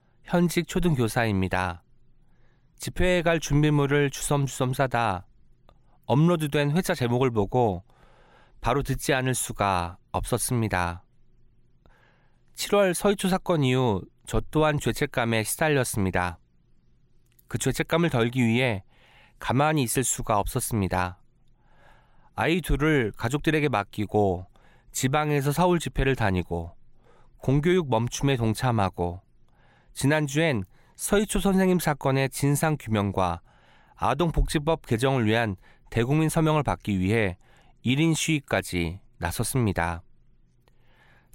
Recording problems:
none

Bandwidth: 16 kHz